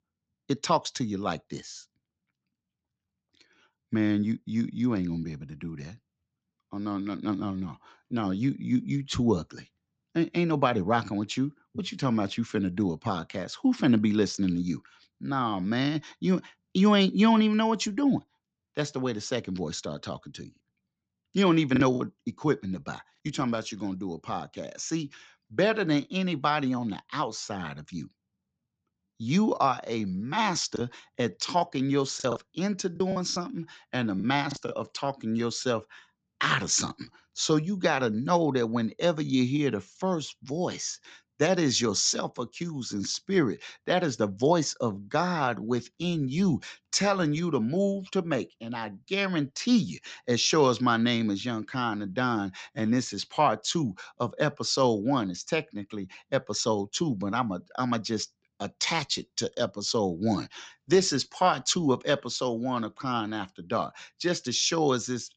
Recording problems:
high frequencies cut off; noticeable; nothing above 8 kHz
choppy; very; at 22 s and from 31 to 35 s; 7% of the speech affected

